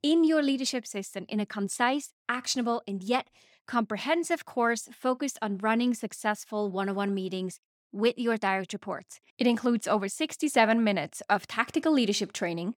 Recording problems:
none

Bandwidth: 18 kHz